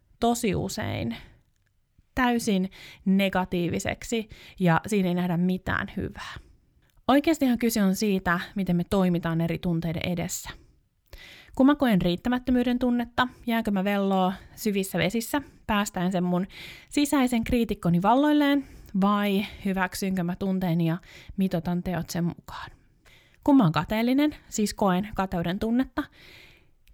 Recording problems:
none

